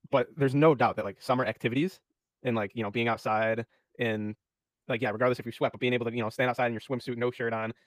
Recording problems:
wrong speed, natural pitch; too fast; 1.6 times normal speed

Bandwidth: 15 kHz